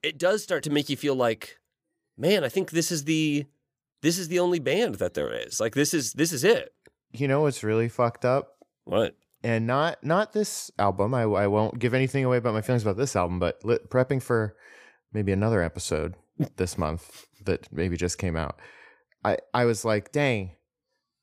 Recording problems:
none

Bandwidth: 15 kHz